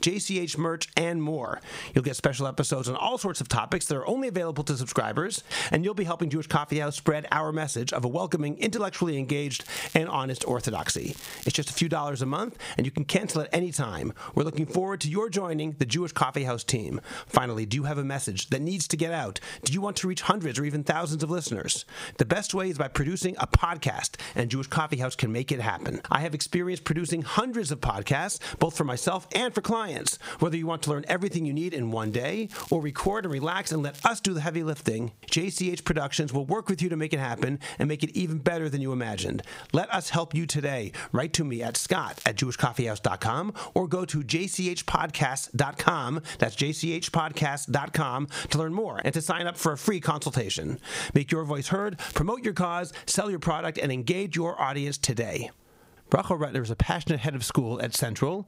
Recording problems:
squashed, flat; somewhat
crackling; noticeable; 4 times, first at 9.5 s; 20 dB below the speech

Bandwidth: 15.5 kHz